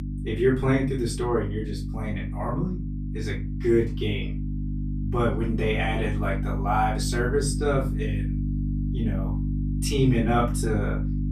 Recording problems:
off-mic speech; far
room echo; slight; dies away in 0.2 s
electrical hum; noticeable; throughout; 50 Hz, 10 dB below the speech

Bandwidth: 14.5 kHz